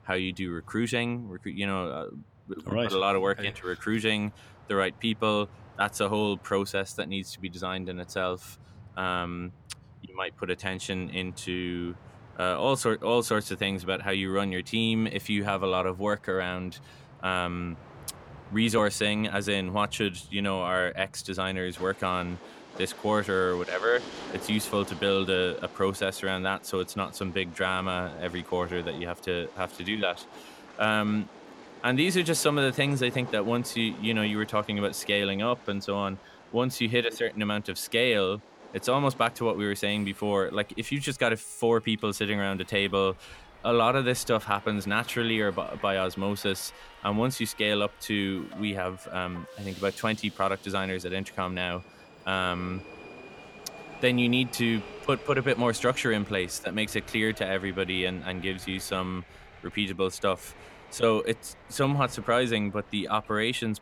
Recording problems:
train or aircraft noise; noticeable; throughout; 20 dB below the speech

